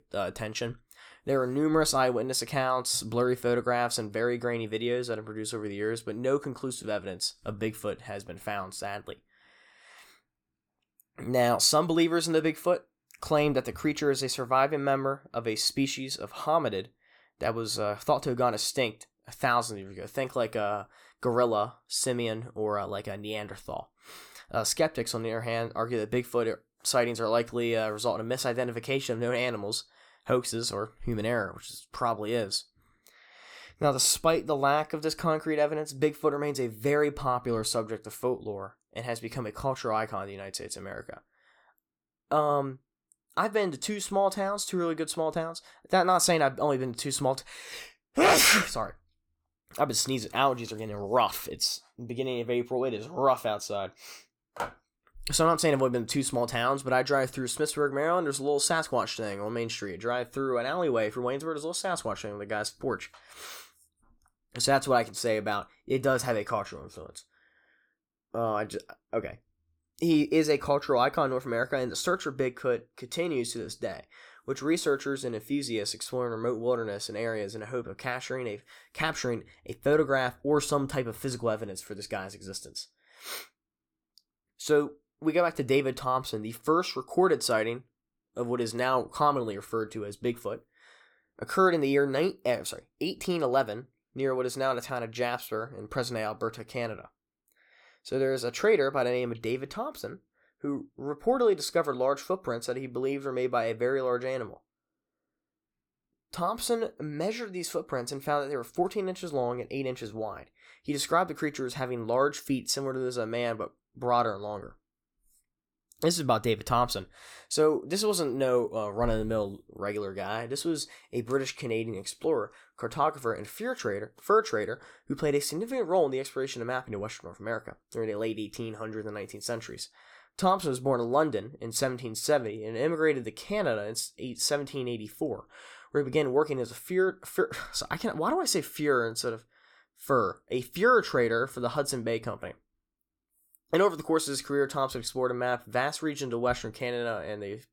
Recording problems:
none

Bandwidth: 18.5 kHz